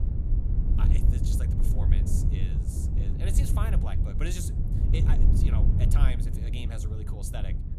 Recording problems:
wind noise on the microphone; heavy; as loud as the speech

